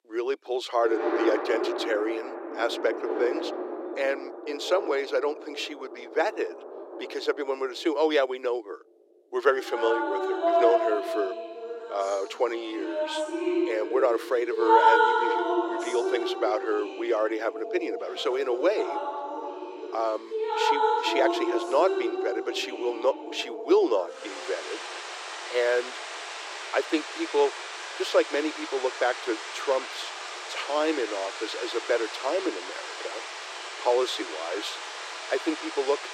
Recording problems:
thin; very; fading below 350 Hz
rain or running water; loud; throughout; 2 dB below the speech

